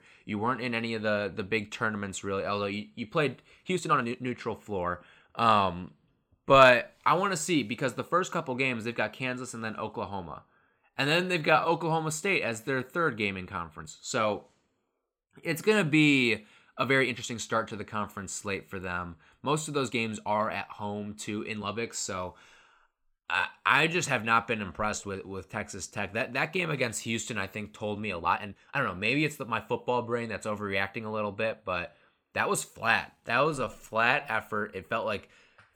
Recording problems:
uneven, jittery; strongly; from 3.5 to 34 s

